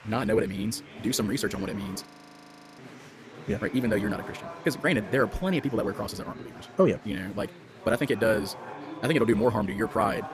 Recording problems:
wrong speed, natural pitch; too fast; 1.7 times normal speed
murmuring crowd; noticeable; throughout; 15 dB below the speech
audio freezing; at 2 s for 0.5 s

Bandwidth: 14.5 kHz